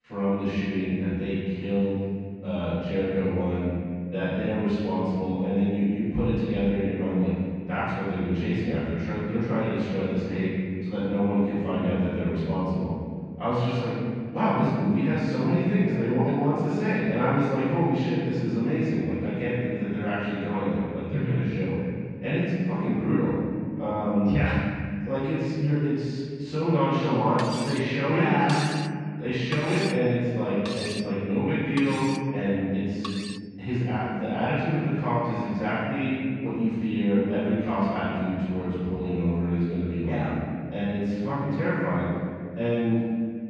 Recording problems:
room echo; strong; dies away in 2 s
off-mic speech; far
muffled; slightly; fading above 2.5 kHz
clattering dishes; noticeable; from 27 to 33 s; peak 7 dB below the speech

